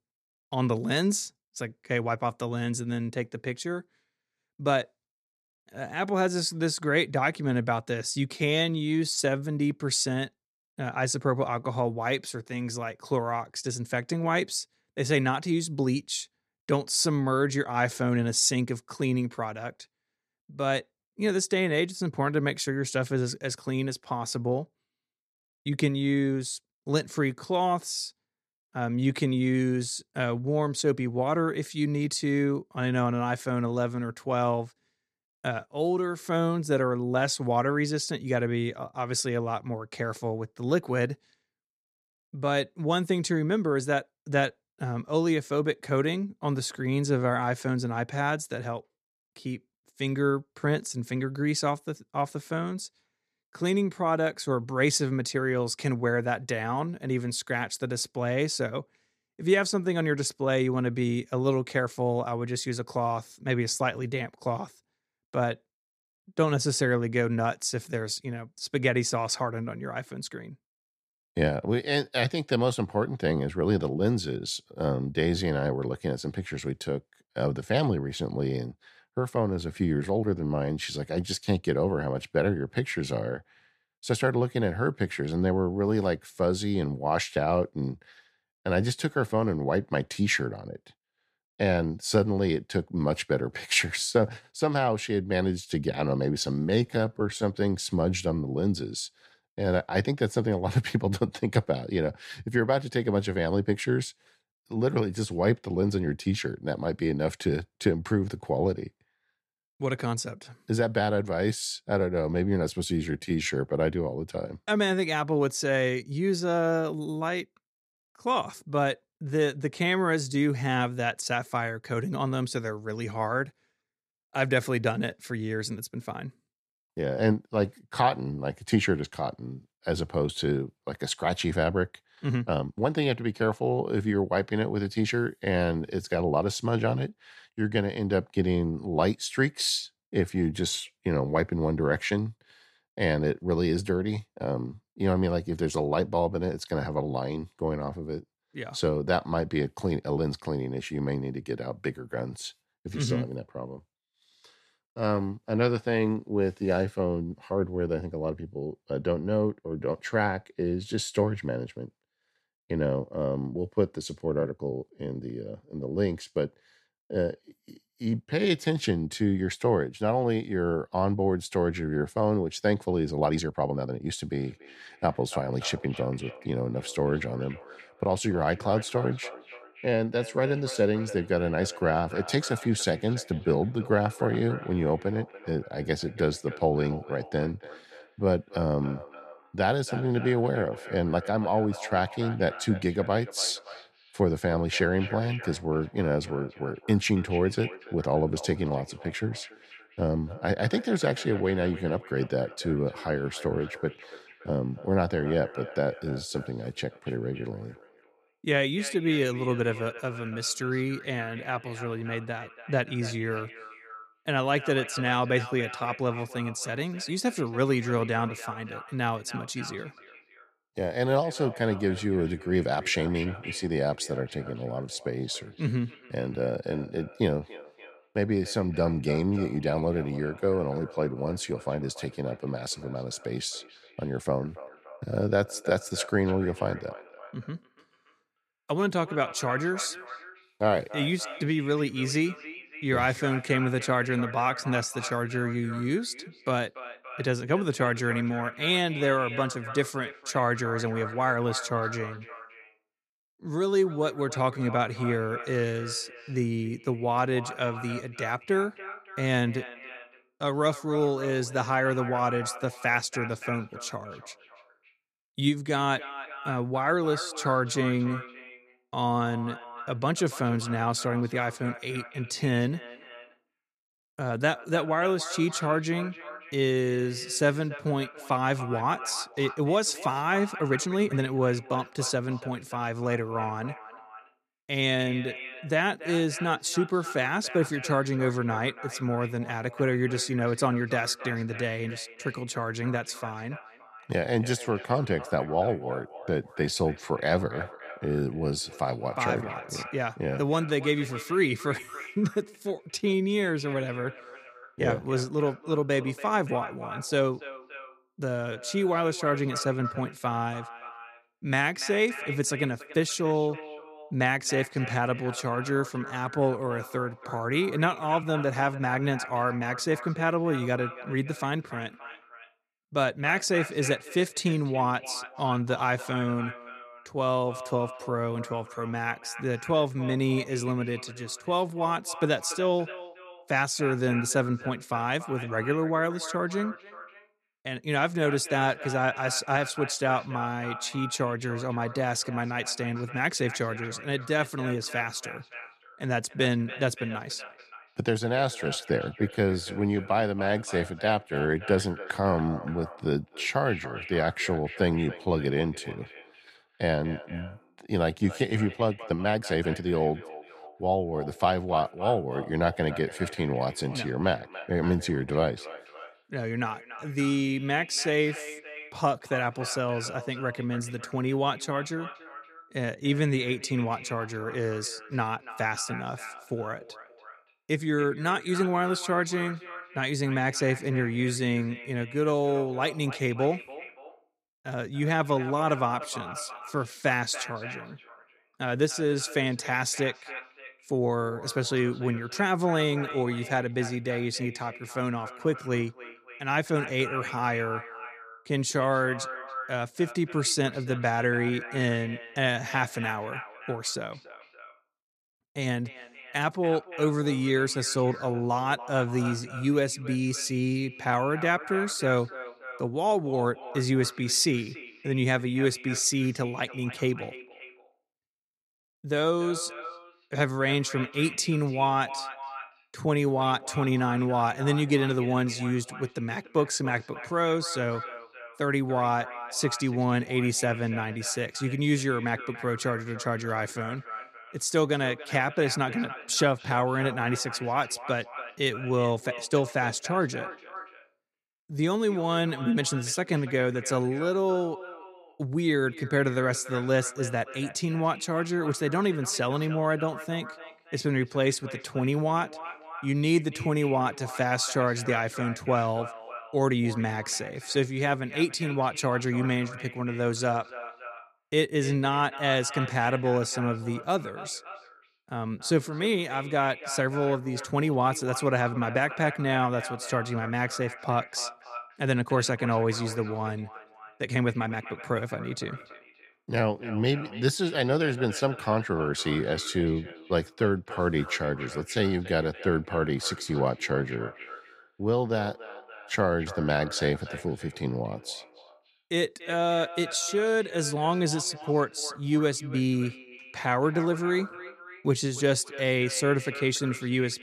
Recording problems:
echo of what is said; noticeable; from 2:54 on; 290 ms later, 15 dB below the speech
uneven, jittery; strongly; from 8.5 s to 8:11

